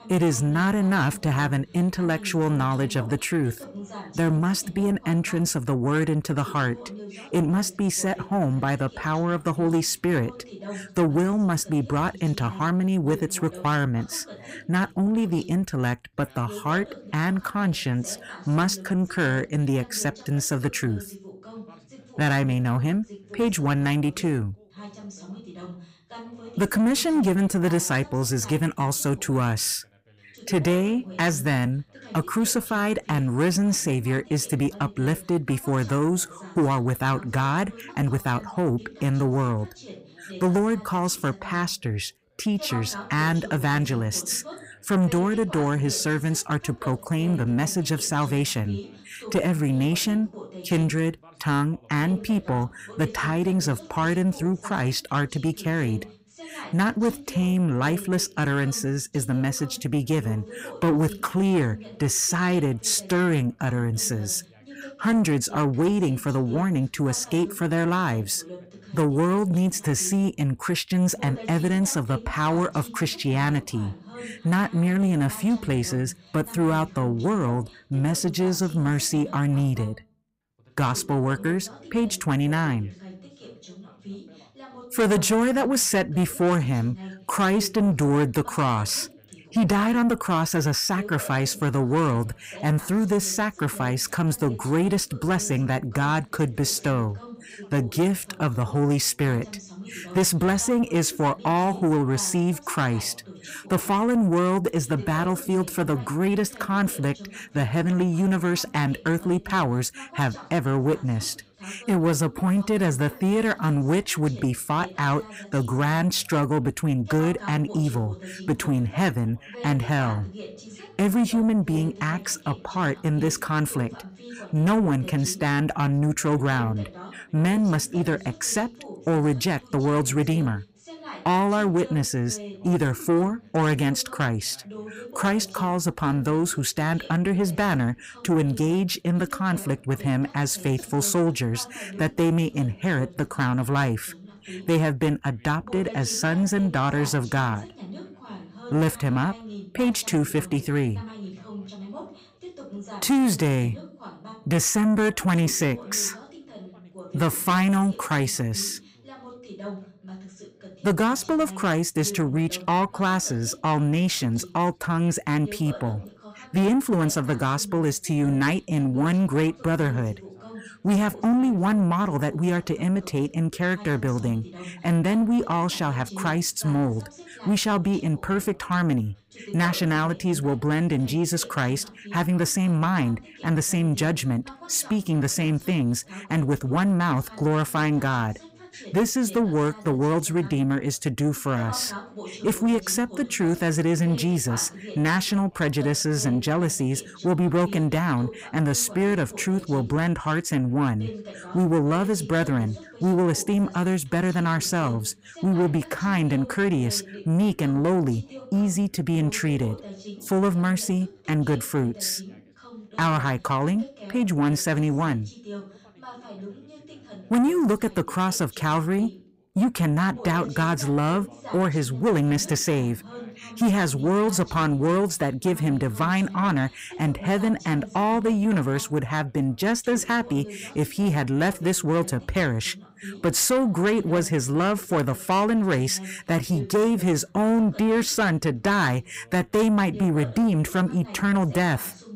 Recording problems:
distortion; slight; 10 dB below the speech
background chatter; noticeable; throughout; 2 voices, 20 dB below the speech

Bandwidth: 15.5 kHz